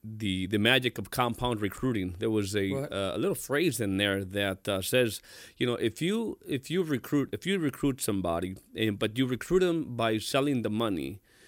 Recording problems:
none

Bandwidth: 16.5 kHz